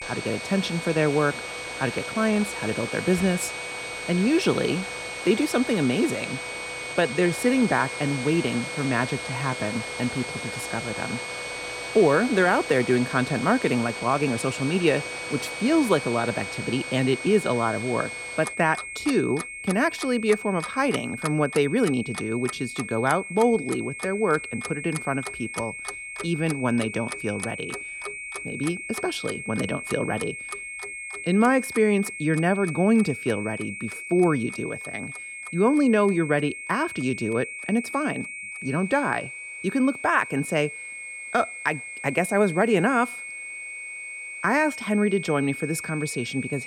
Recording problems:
high-pitched whine; loud; throughout; 2 kHz, 9 dB below the speech
household noises; noticeable; throughout; 10 dB below the speech
uneven, jittery; slightly; from 2 to 14 s

